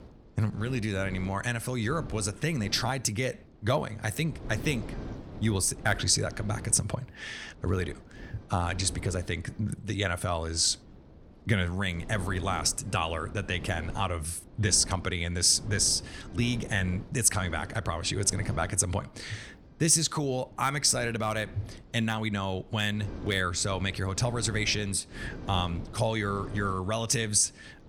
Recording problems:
wind noise on the microphone; occasional gusts; 20 dB below the speech

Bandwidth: 17.5 kHz